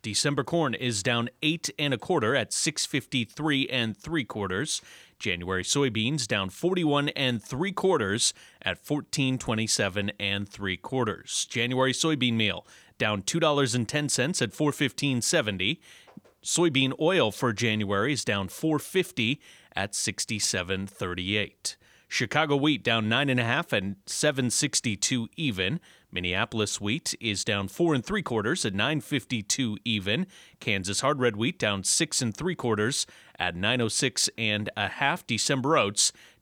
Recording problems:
none

